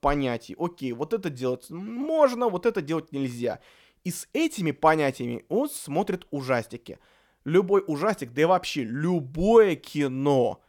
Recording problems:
none

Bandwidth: 17.5 kHz